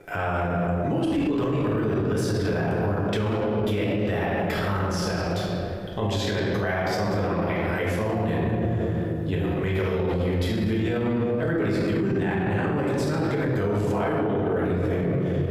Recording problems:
room echo; strong; dies away in 2.4 s
off-mic speech; far
squashed, flat; heavily

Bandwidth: 15.5 kHz